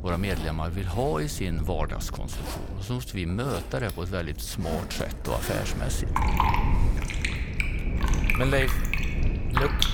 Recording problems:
household noises; loud; throughout; 3 dB below the speech
low rumble; noticeable; throughout; 10 dB below the speech

